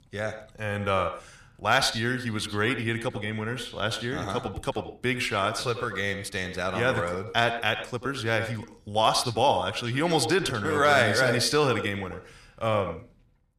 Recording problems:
echo of what is said; strong; throughout; 90 ms later, 9 dB below the speech

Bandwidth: 14.5 kHz